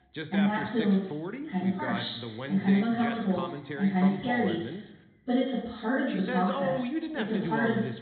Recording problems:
off-mic speech; far
high frequencies cut off; severe; nothing above 4 kHz
room echo; noticeable; dies away in 0.6 s
voice in the background; loud; throughout; 7 dB below the speech

